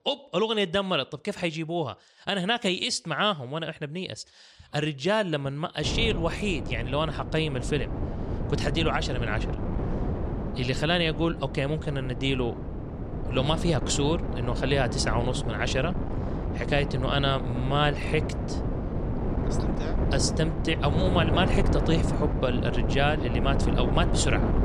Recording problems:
wind noise on the microphone; heavy; from 6 s on; 7 dB below the speech

